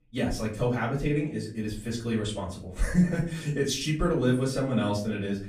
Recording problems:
off-mic speech; far
room echo; slight; dies away in 0.4 s

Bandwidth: 14.5 kHz